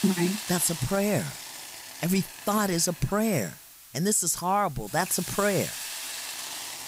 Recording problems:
hiss; loud; throughout; 9 dB below the speech

